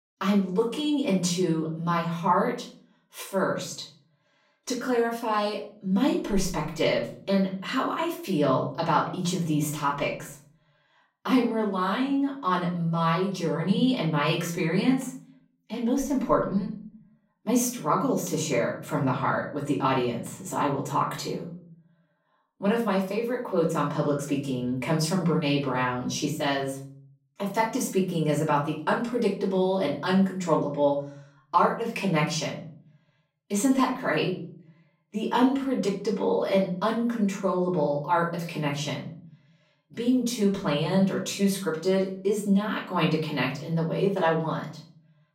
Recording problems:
off-mic speech; far
room echo; slight; dies away in 0.6 s

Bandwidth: 16 kHz